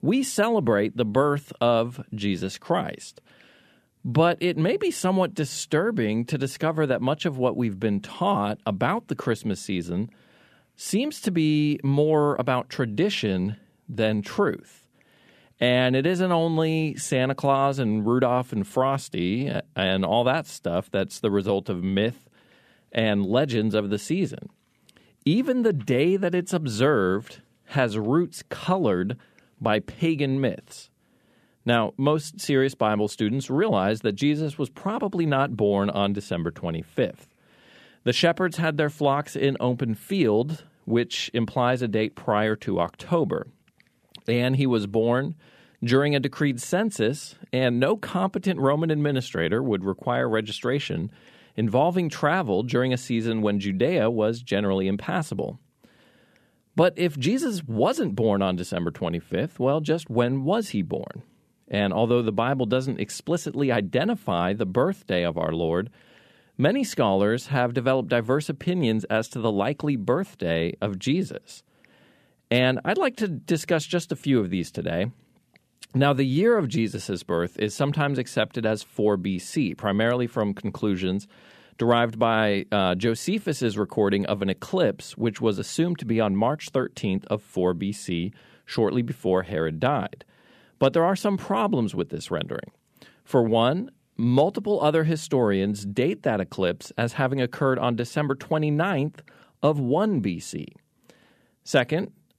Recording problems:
none

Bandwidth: 14.5 kHz